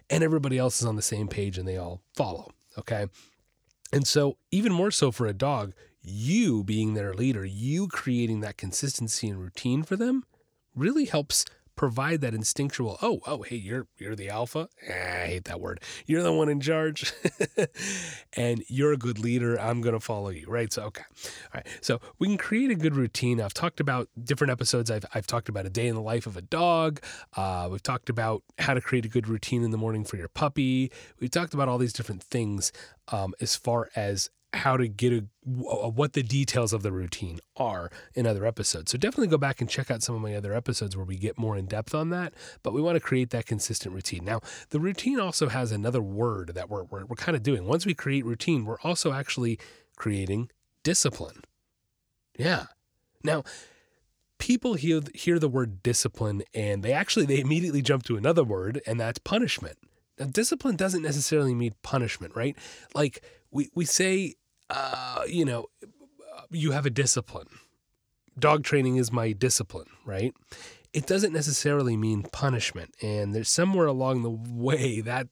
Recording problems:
none

